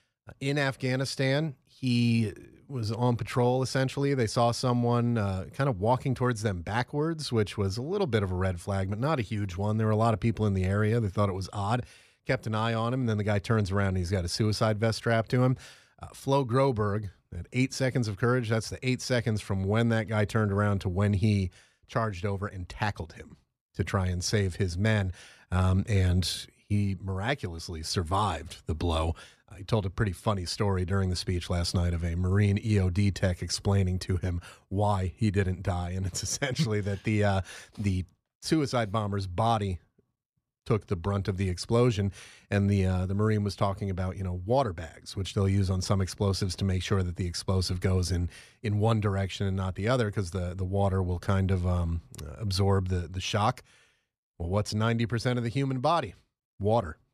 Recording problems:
none

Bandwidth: 14.5 kHz